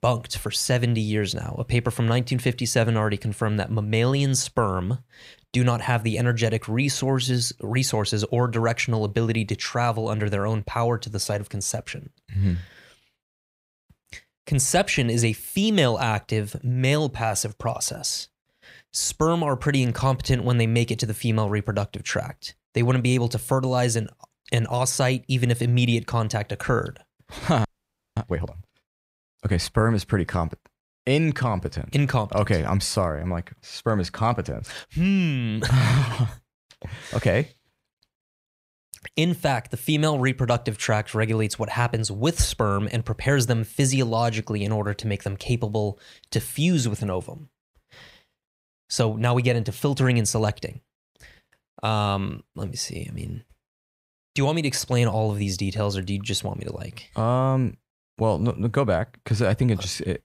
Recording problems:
audio freezing; at 28 s for 0.5 s

